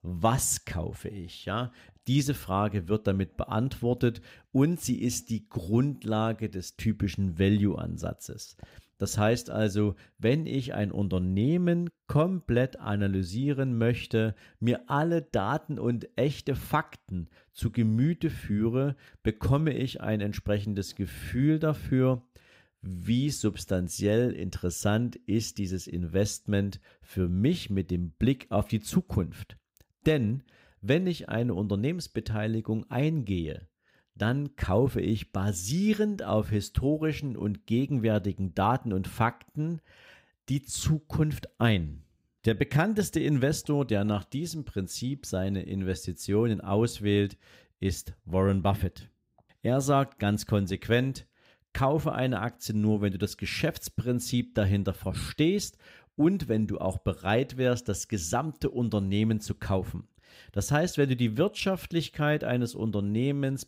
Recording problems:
none

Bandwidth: 15.5 kHz